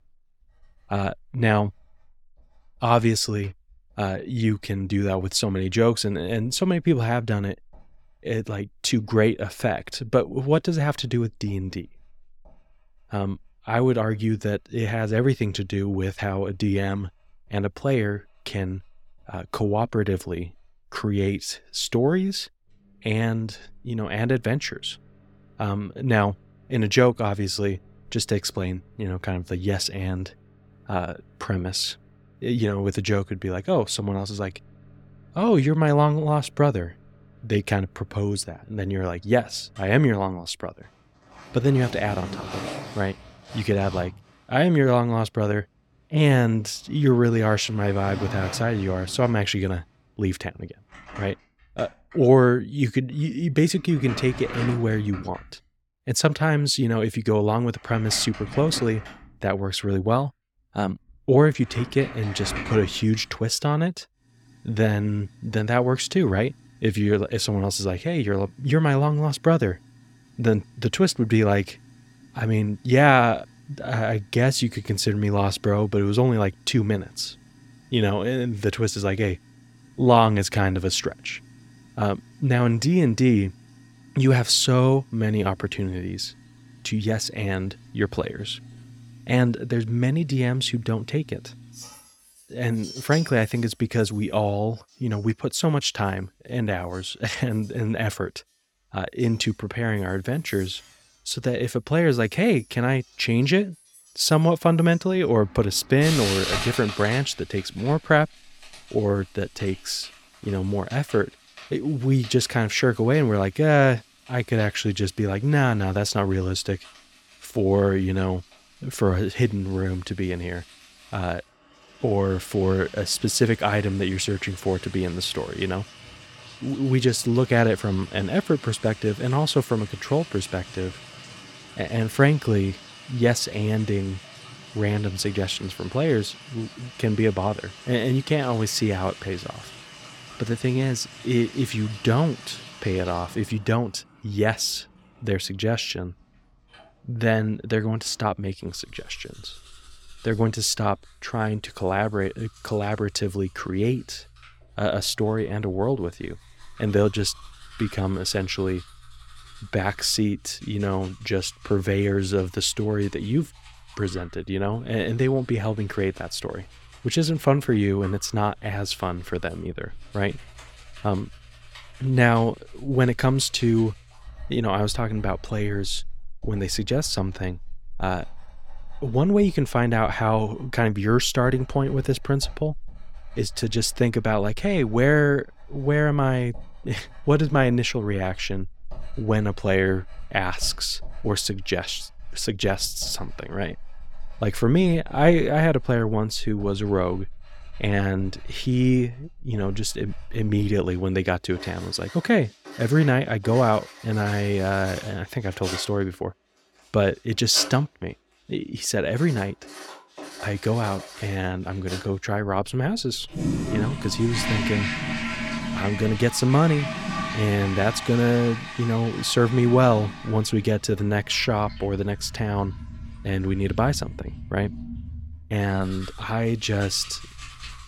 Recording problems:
household noises; noticeable; throughout; 15 dB below the speech

